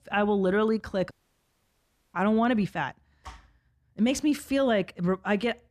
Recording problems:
audio cutting out; at 1 s for 1 s

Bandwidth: 14.5 kHz